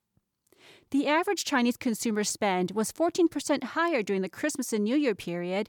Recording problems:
none

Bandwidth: 18.5 kHz